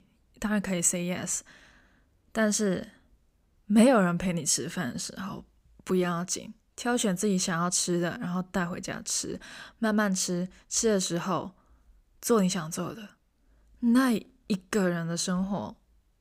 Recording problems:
none

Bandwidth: 15.5 kHz